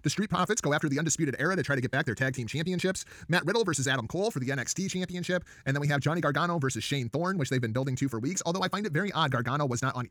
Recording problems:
wrong speed, natural pitch; too fast; 1.5 times normal speed

